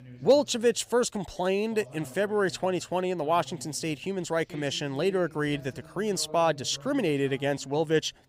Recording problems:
voice in the background; faint; throughout; 20 dB below the speech

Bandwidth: 15.5 kHz